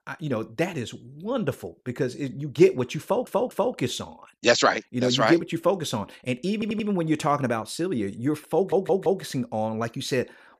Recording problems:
audio stuttering; at 3 s, at 6.5 s and at 8.5 s

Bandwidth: 15 kHz